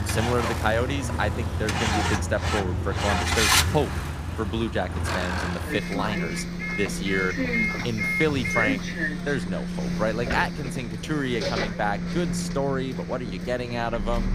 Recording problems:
traffic noise; very loud; throughout; 2 dB above the speech

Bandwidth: 15 kHz